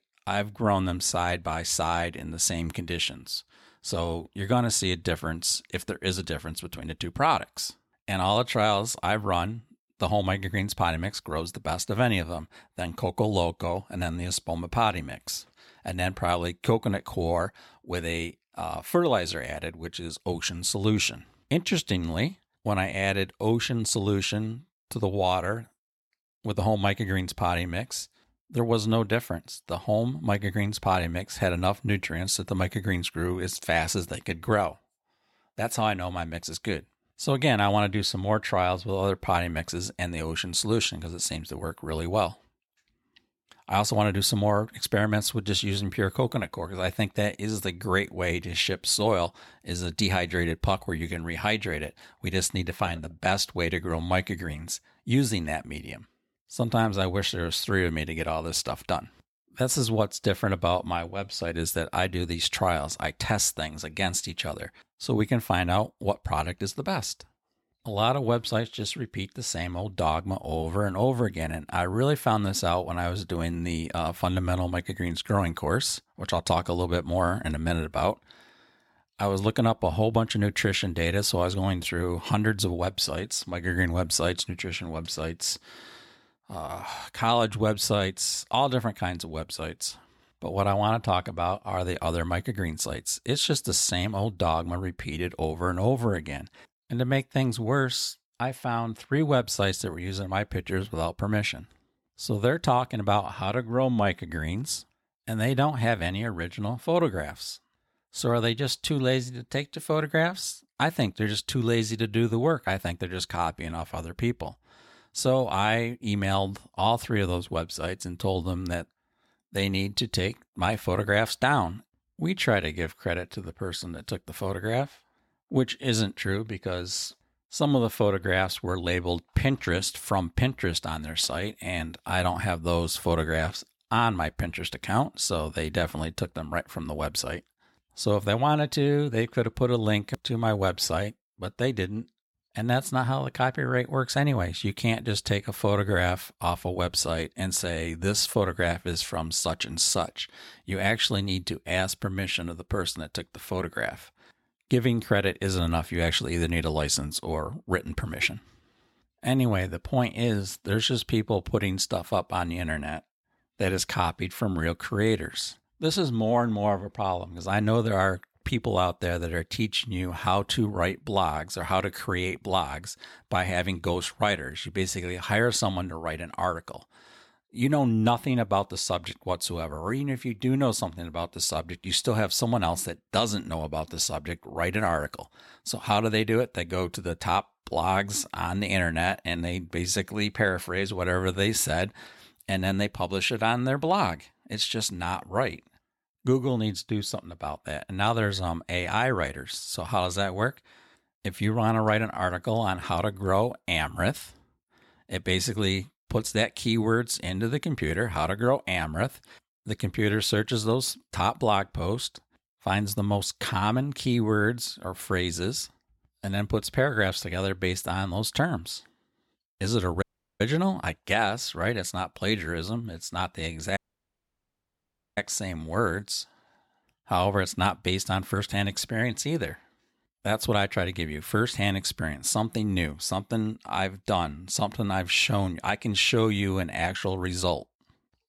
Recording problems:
audio cutting out; at 3:40 and at 3:44 for 1.5 s

